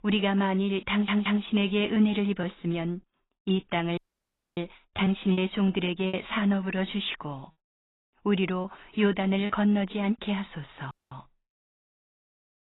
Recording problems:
garbled, watery; badly; nothing above 3.5 kHz
choppy; occasionally; 3% of the speech affected
audio stuttering; at 1 s
audio cutting out; at 4 s for 0.5 s and at 11 s

